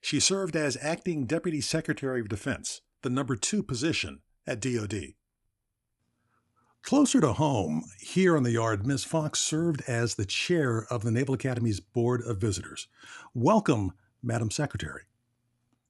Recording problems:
none

